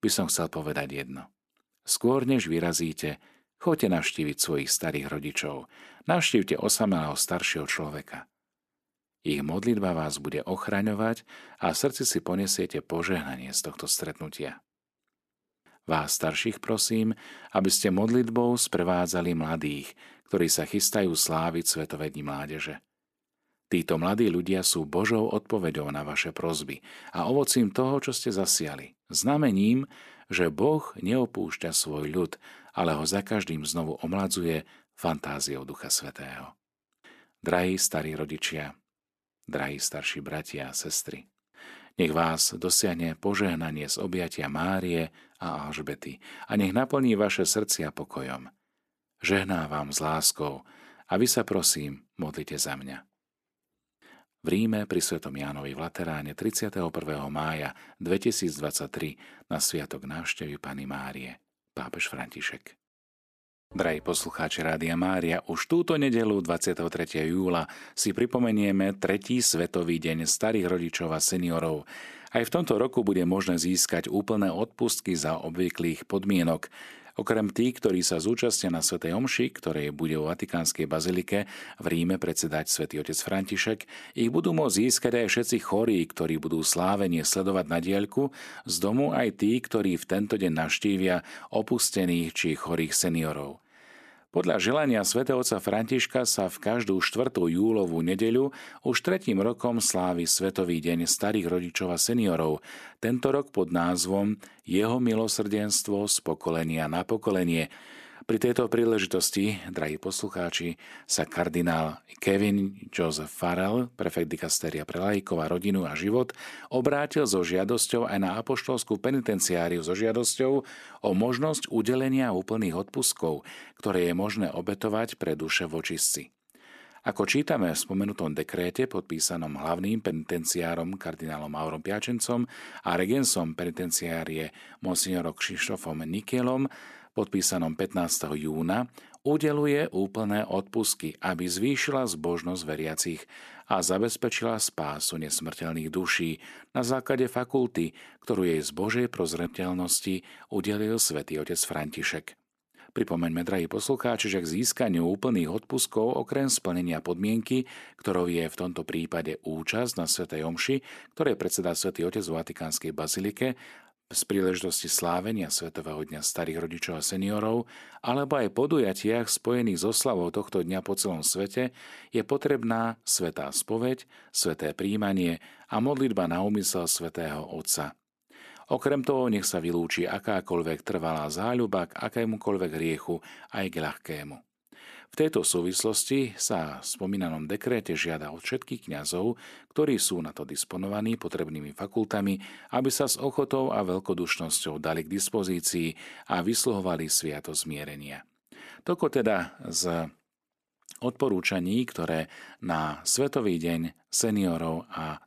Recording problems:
none

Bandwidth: 14 kHz